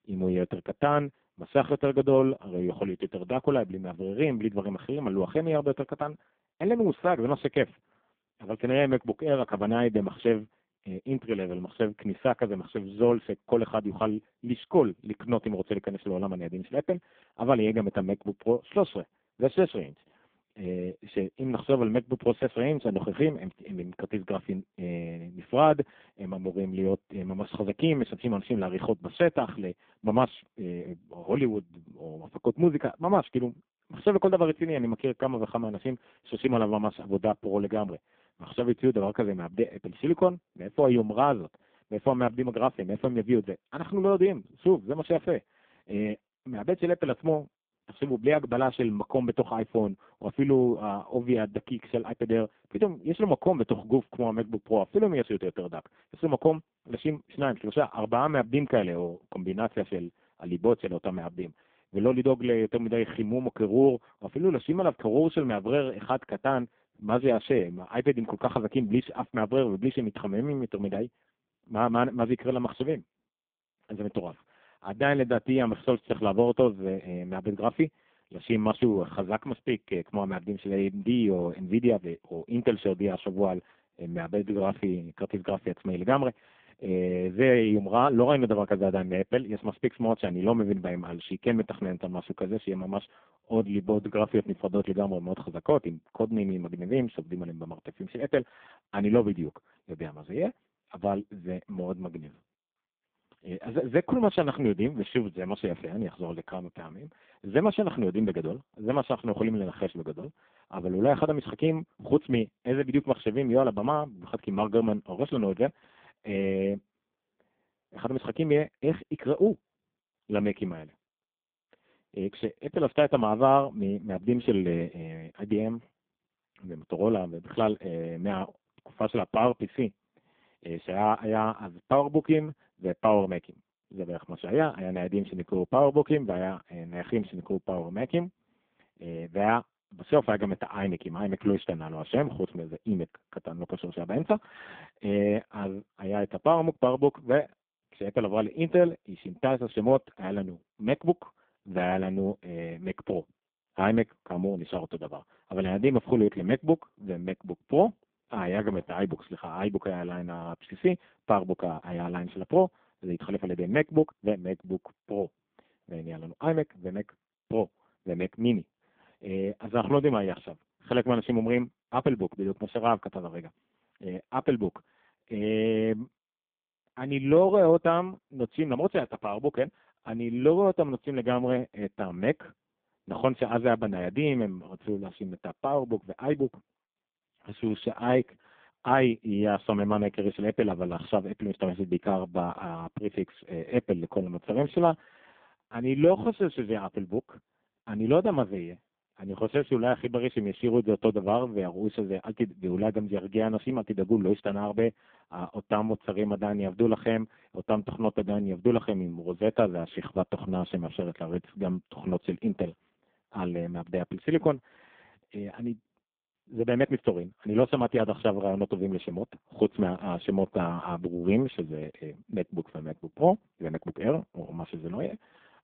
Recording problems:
phone-call audio; poor line
uneven, jittery; strongly; from 10 s to 3:44

